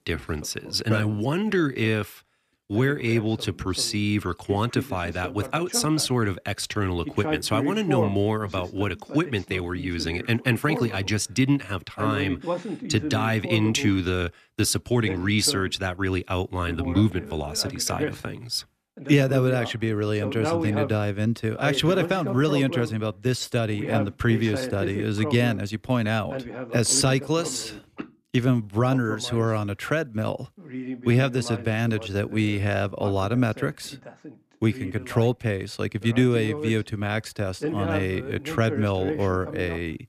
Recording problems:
voice in the background; loud; throughout; 9 dB below the speech

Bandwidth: 14.5 kHz